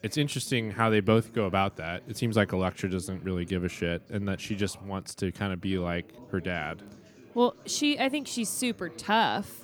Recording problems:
background chatter; faint; throughout; 4 voices, 20 dB below the speech

